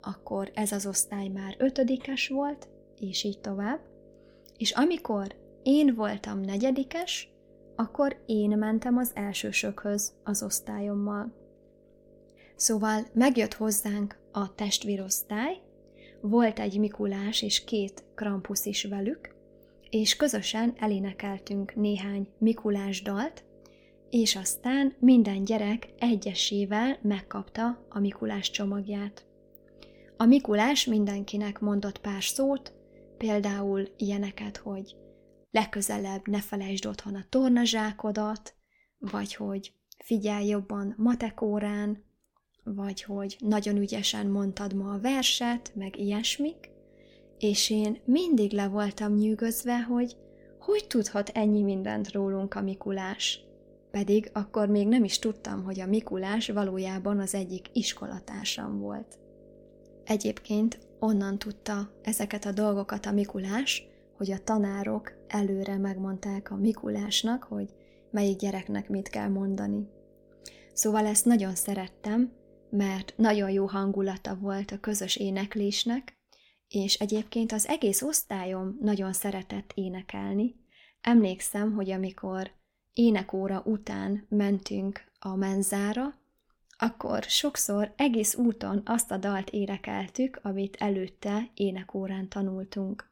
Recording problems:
electrical hum; faint; until 35 s and from 44 s to 1:14; 50 Hz, 25 dB below the speech

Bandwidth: 17 kHz